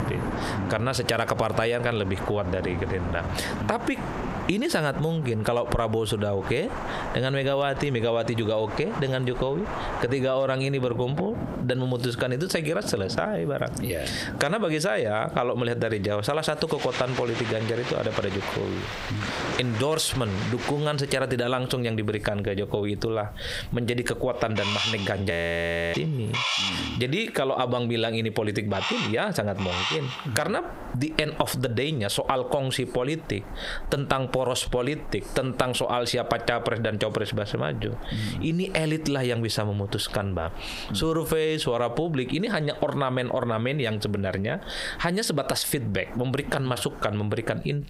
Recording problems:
squashed, flat; heavily, background pumping
rain or running water; loud; until 21 s; 8 dB below the speech
animal sounds; loud; from 18 s on; 7 dB below the speech
audio freezing; at 25 s for 0.5 s

